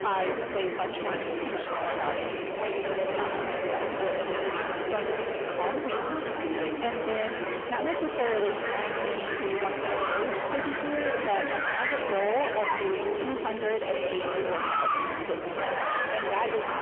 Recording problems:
phone-call audio; poor line; nothing above 3 kHz
distortion; heavy; 37% of the sound clipped
murmuring crowd; very loud; throughout; 1 dB above the speech

